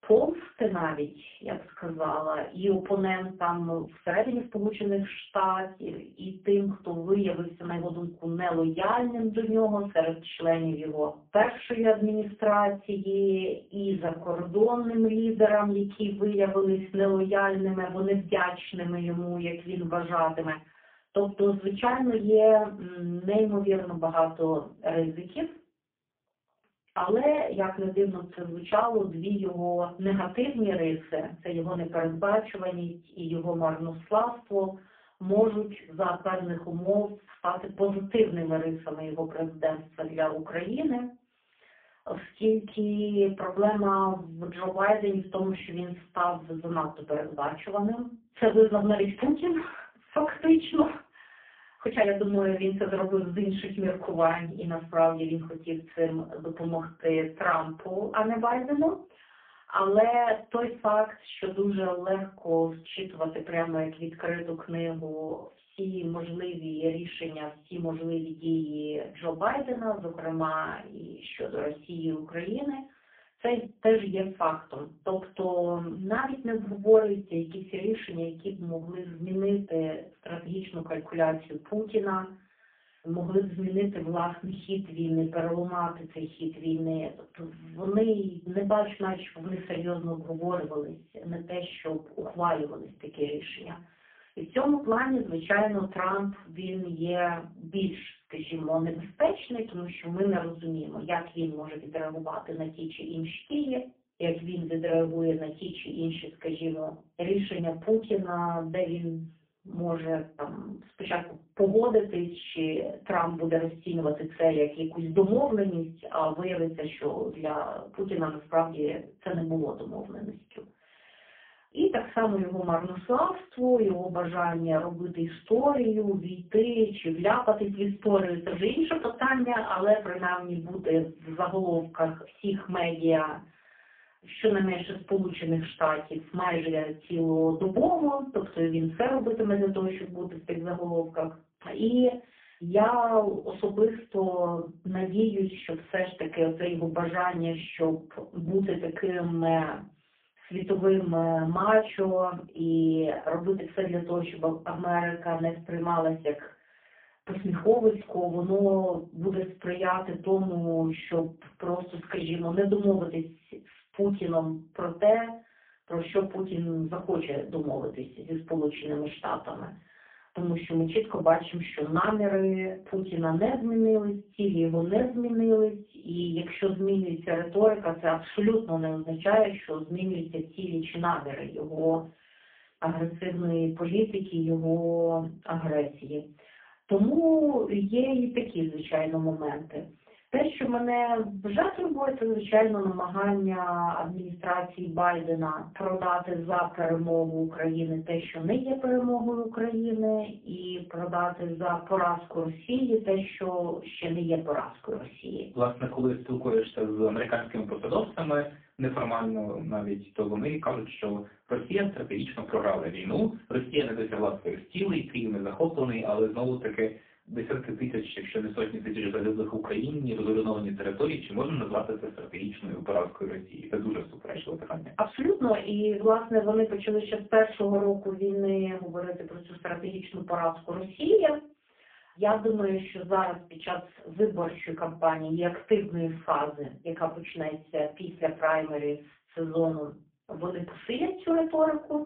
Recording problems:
phone-call audio; poor line
off-mic speech; far
room echo; very slight; dies away in 0.3 s
uneven, jittery; strongly; from 1 s to 3:46

